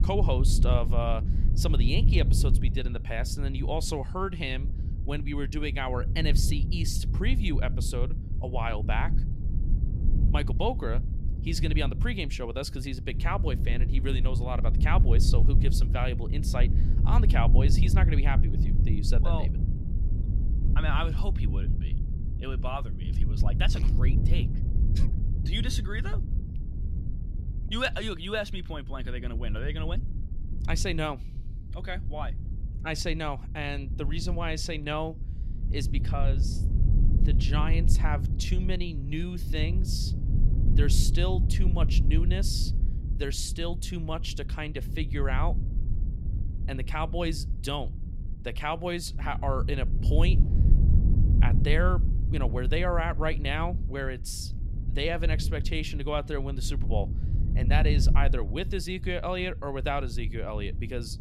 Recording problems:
low rumble; noticeable; throughout; 10 dB below the speech

